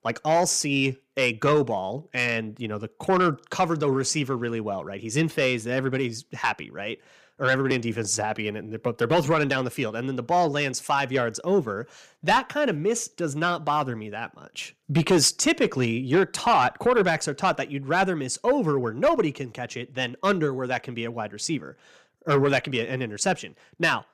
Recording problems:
distortion; slight; 10 dB below the speech

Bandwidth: 15 kHz